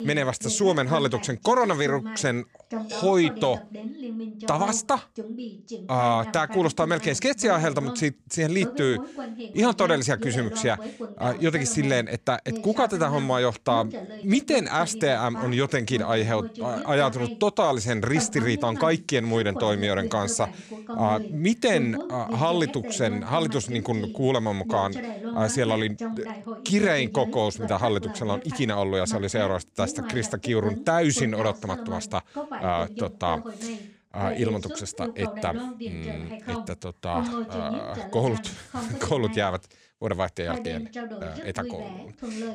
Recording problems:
voice in the background; noticeable; throughout; 10 dB below the speech

